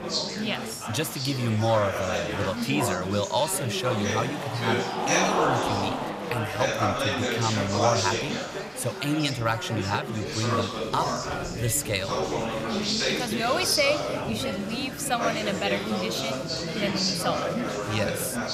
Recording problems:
chatter from many people; very loud; throughout; 1 dB above the speech

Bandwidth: 14.5 kHz